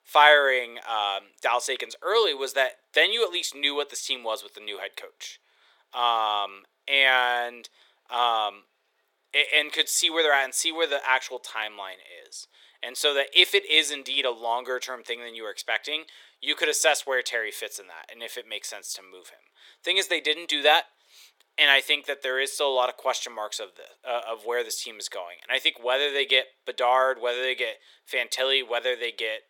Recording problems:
thin; very; fading below 400 Hz

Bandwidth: 17 kHz